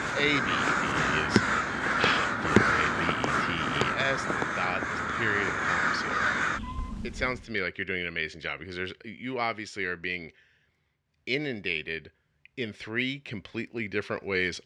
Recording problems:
animal sounds; very loud; until 7.5 s; 5 dB above the speech

